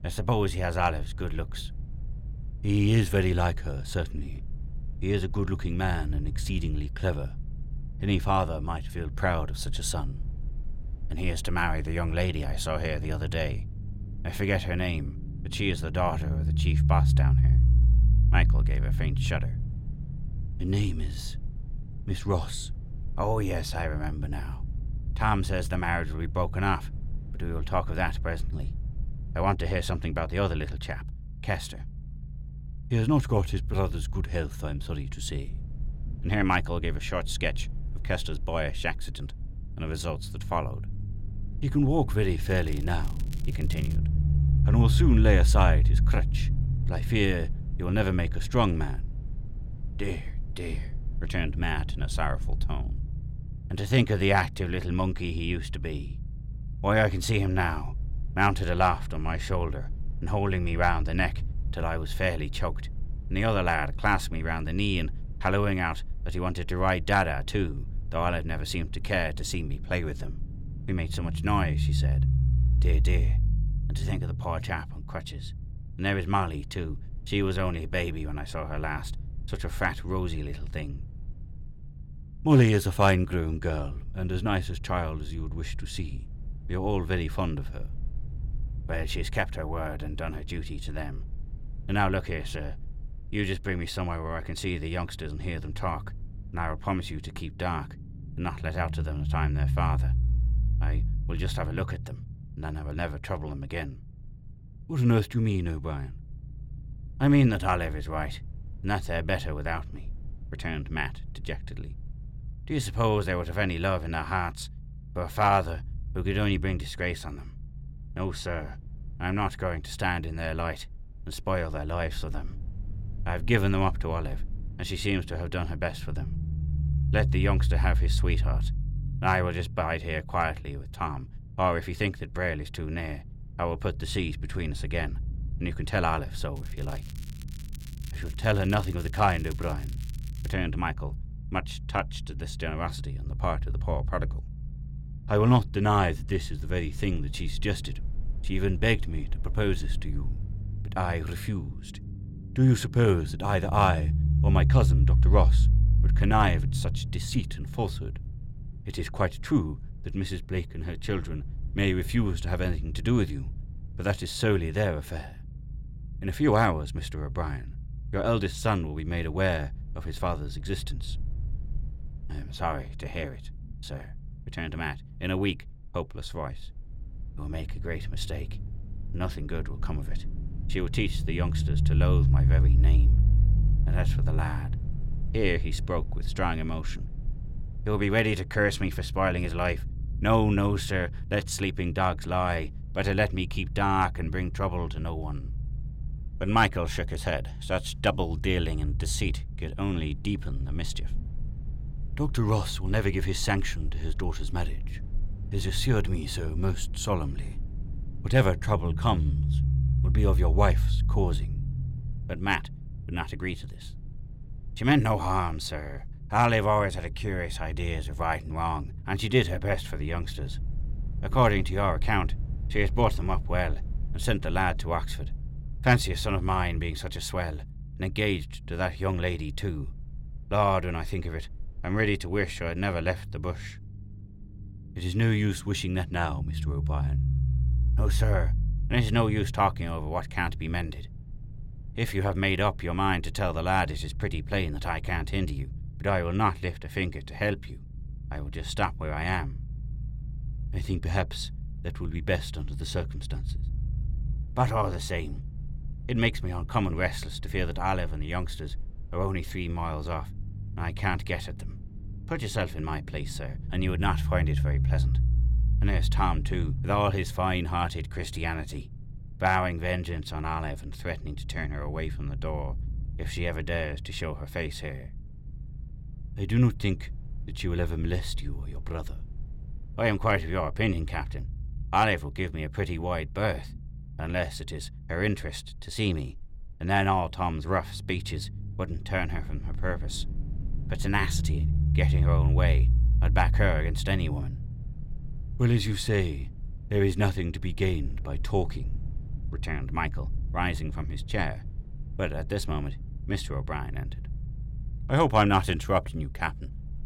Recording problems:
low rumble; noticeable; throughout; 20 dB below the speech
crackling; faint; from 42 to 44 s and from 2:17 to 2:21; 20 dB below the speech

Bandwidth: 16.5 kHz